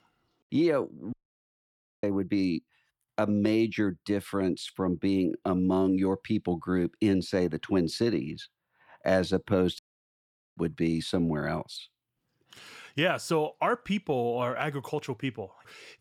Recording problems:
audio cutting out; at 1 s for 1 s and at 10 s for 1 s

